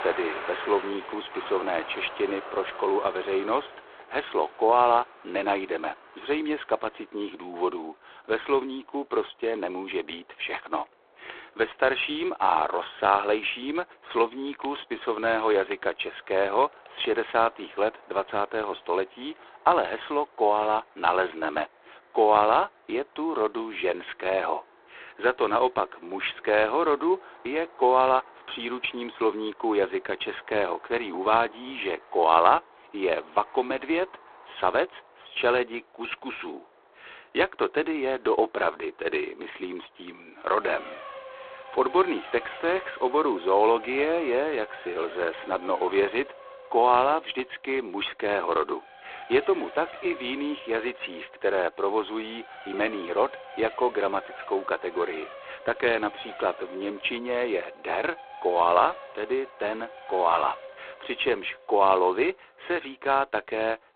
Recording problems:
phone-call audio; poor line
traffic noise; noticeable; throughout; 15 dB below the speech

